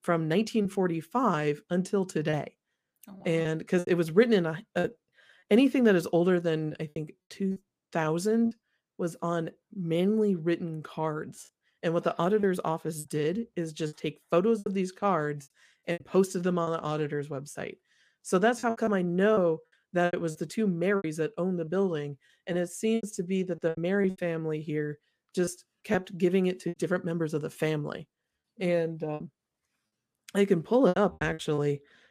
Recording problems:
choppy; very; 8% of the speech affected

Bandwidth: 15 kHz